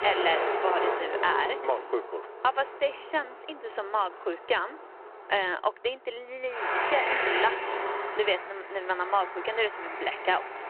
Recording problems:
phone-call audio
traffic noise; loud; throughout; 1 dB below the speech

